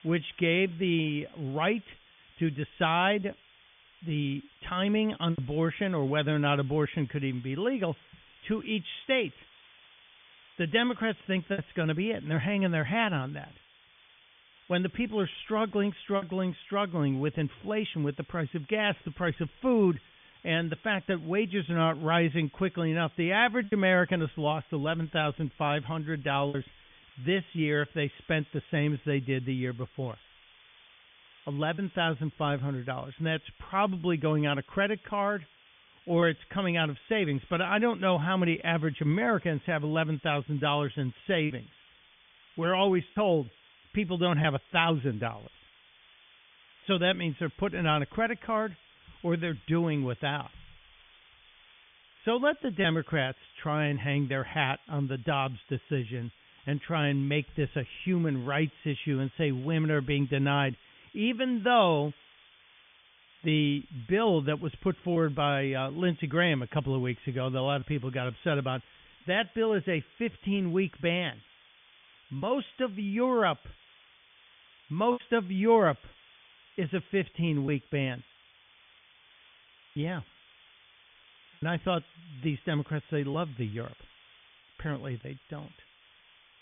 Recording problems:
high frequencies cut off; severe; nothing above 3.5 kHz
hiss; faint; throughout; 25 dB below the speech
choppy; occasionally; 1% of the speech affected

